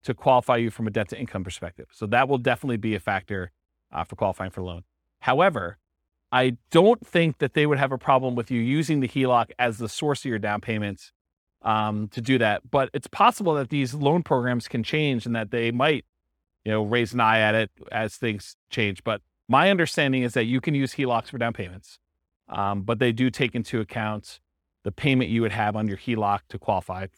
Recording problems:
none

